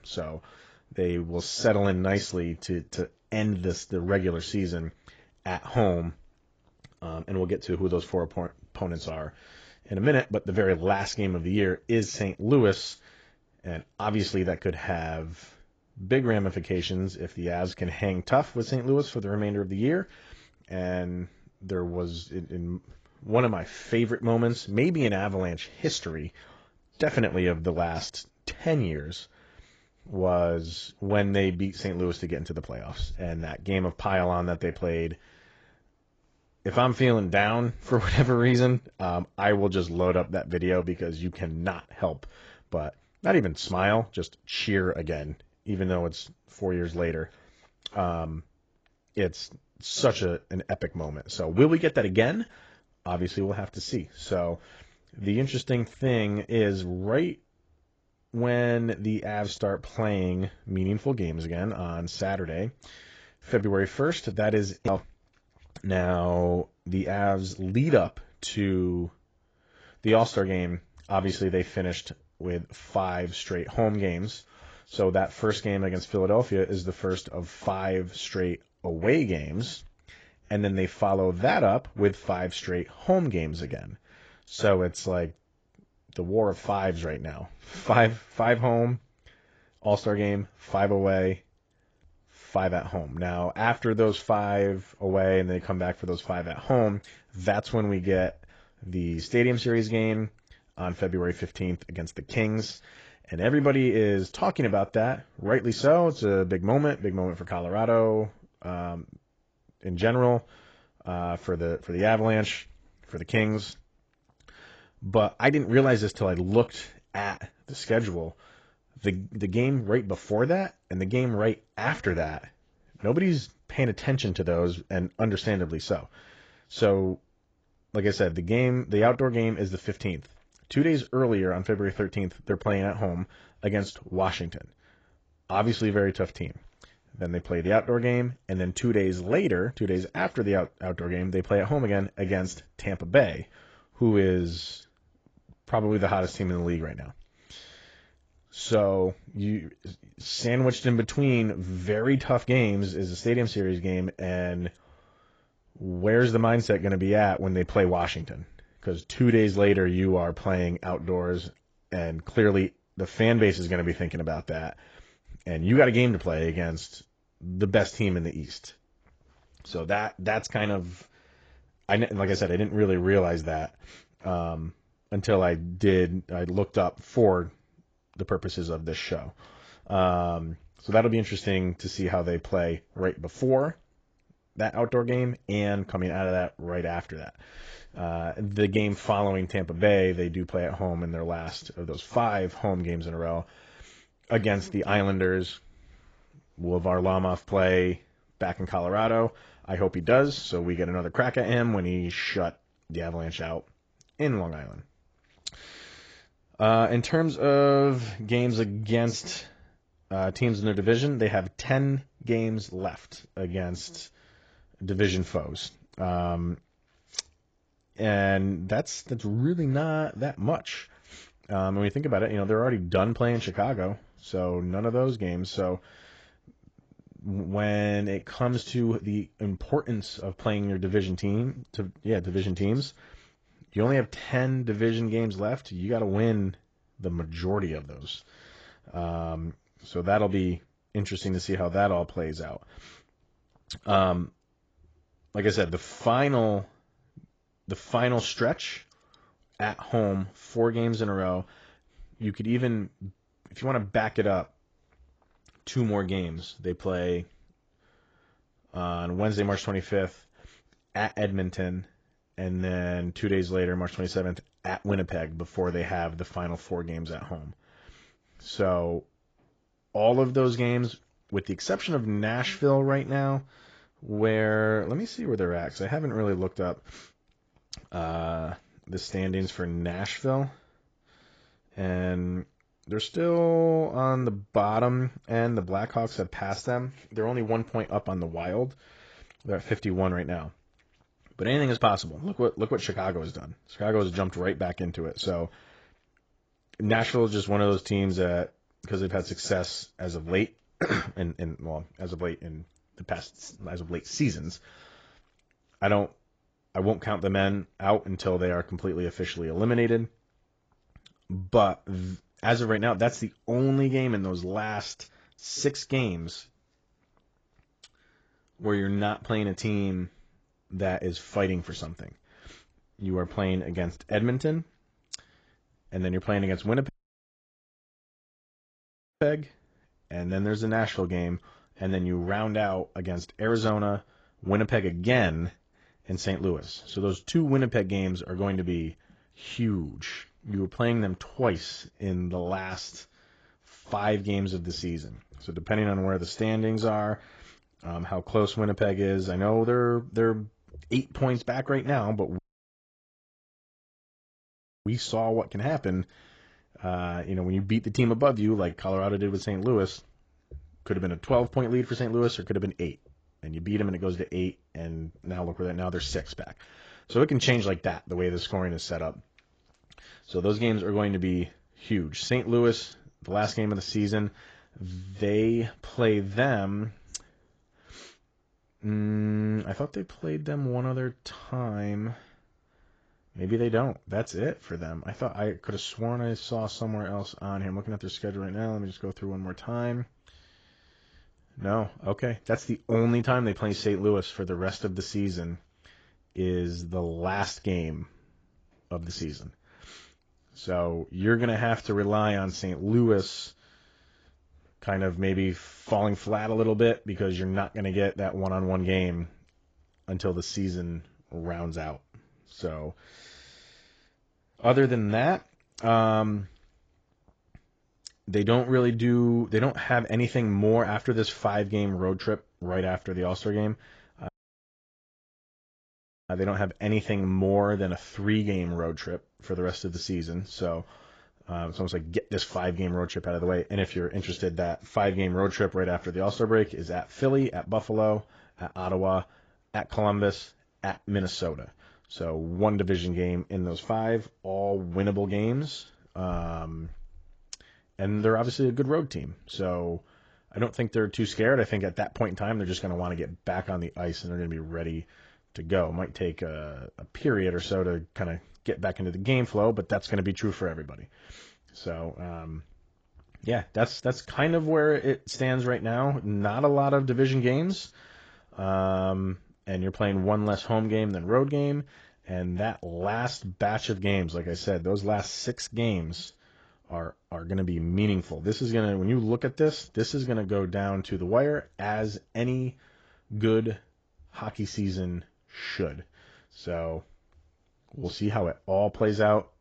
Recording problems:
garbled, watery; badly; nothing above 7.5 kHz
audio cutting out; at 5:27 for 2.5 s, at 5:52 for 2.5 s and at 7:04 for 2 s

